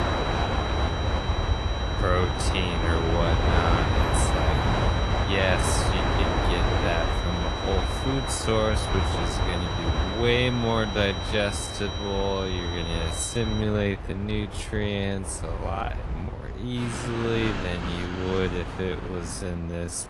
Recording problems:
wrong speed, natural pitch; too slow; 0.5 times normal speed
garbled, watery; slightly
train or aircraft noise; very loud; throughout; 1 dB above the speech
high-pitched whine; loud; until 14 s; 4 kHz, 7 dB below the speech

